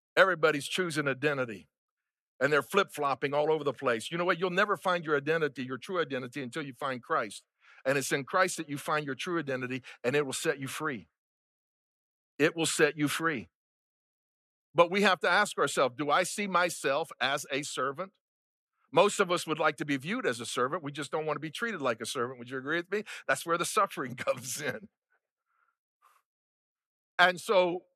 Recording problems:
none

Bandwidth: 13.5 kHz